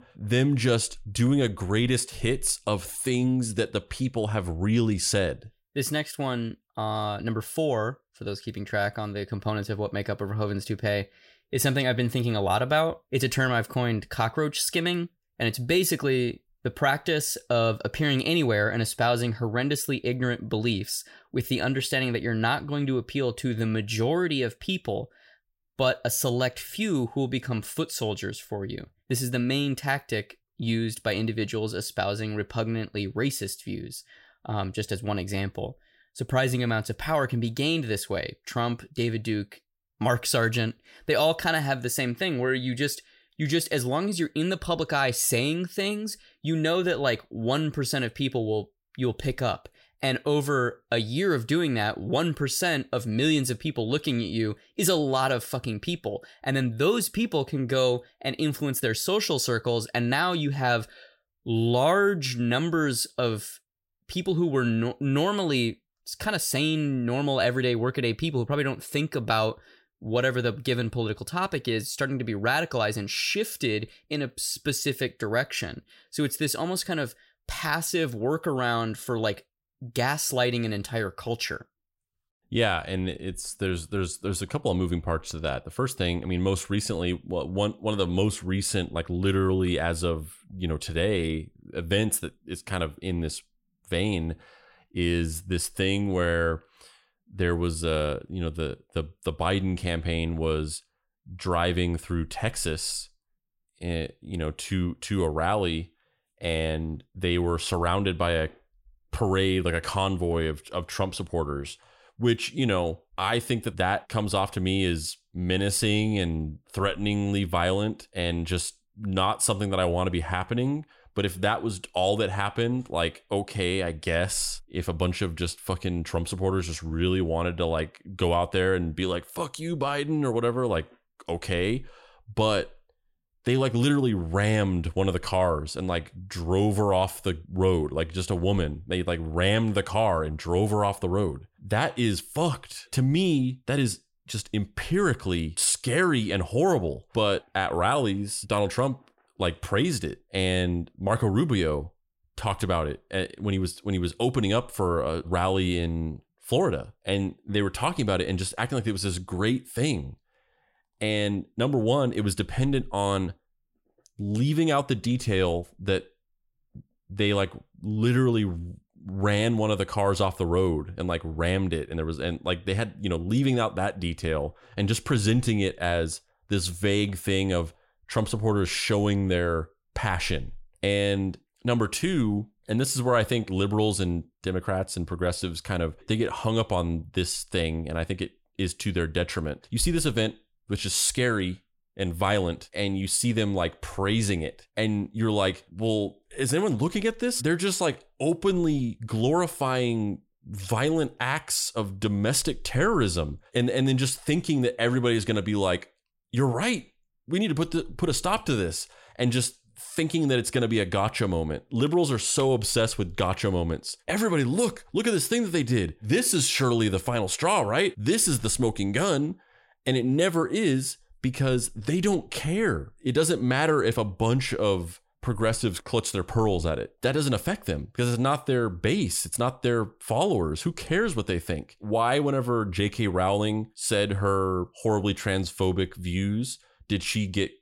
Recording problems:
none

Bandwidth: 16 kHz